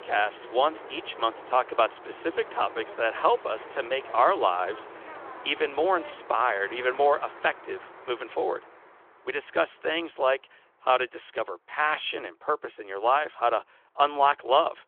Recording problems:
phone-call audio; nothing above 3.5 kHz
traffic noise; noticeable; throughout; 15 dB below the speech

